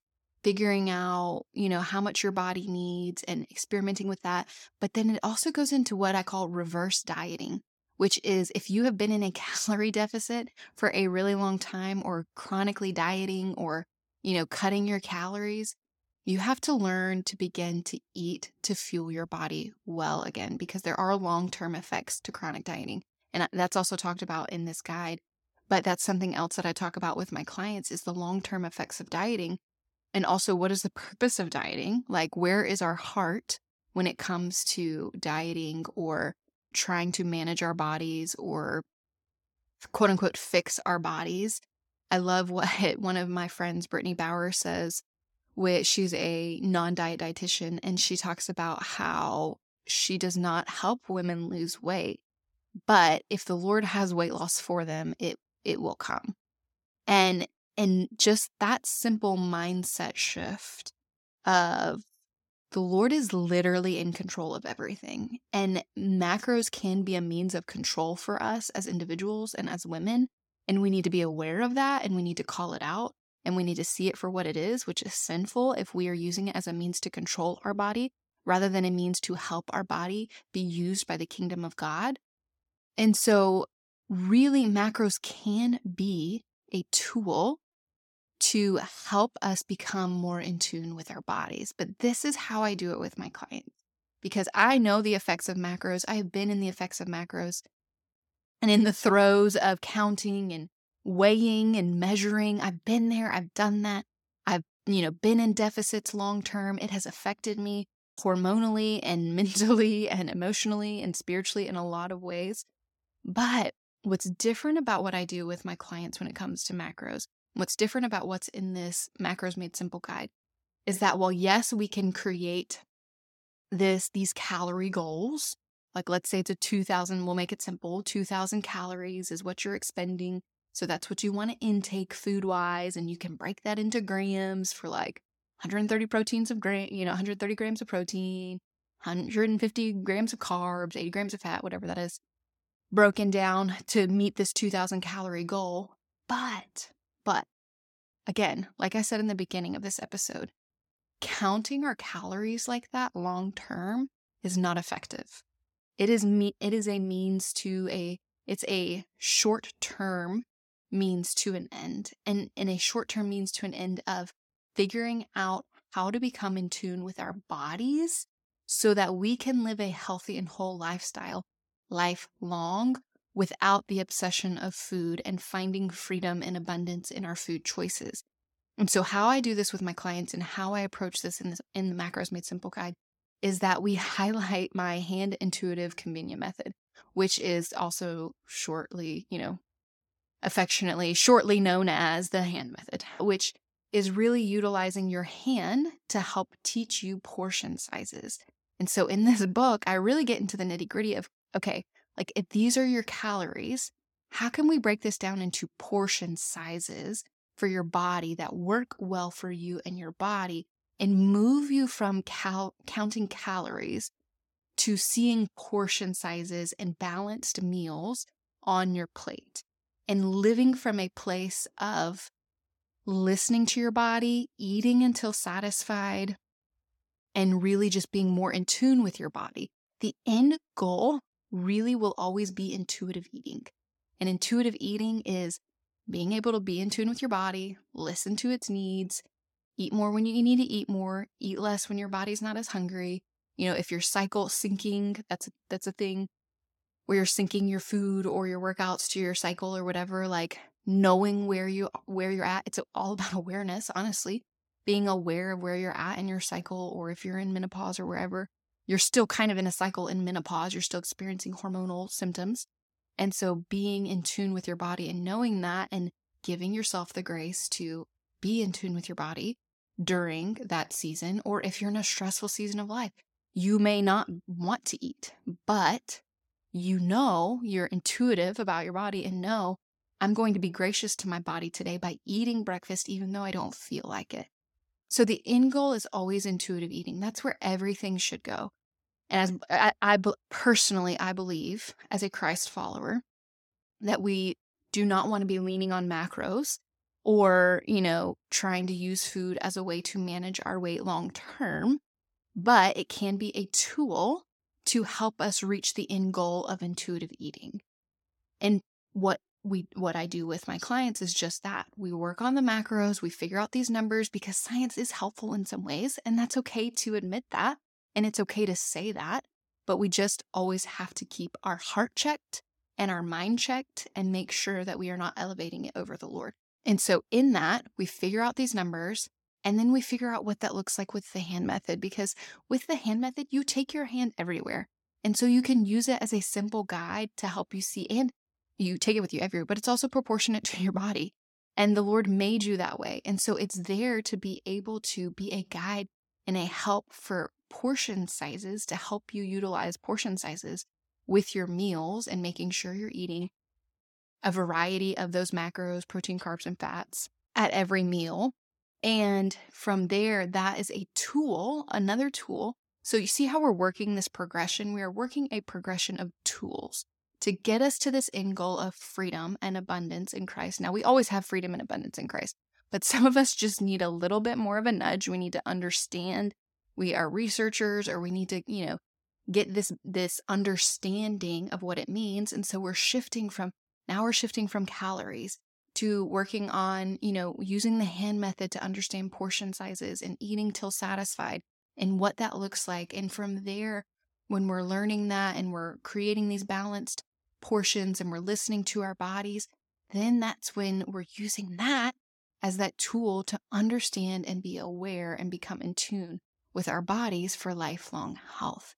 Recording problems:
none

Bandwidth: 17 kHz